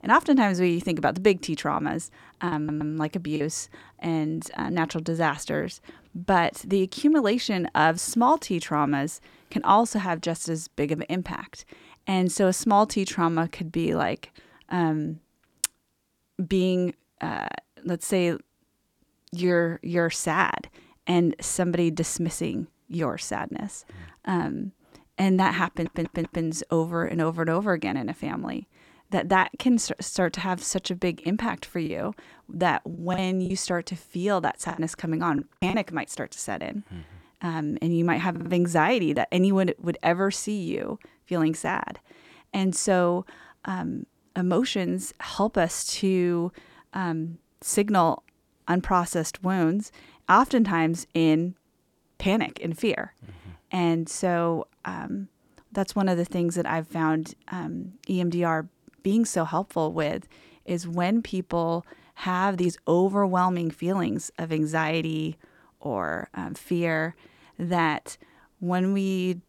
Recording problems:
choppy; very; at 2.5 s and from 32 to 36 s; 11% of the speech affected
audio stuttering; at 2.5 s, at 26 s and at 38 s

